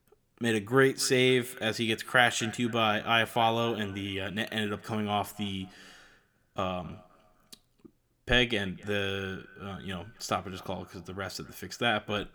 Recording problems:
echo of what is said; faint; throughout; 260 ms later, 20 dB below the speech

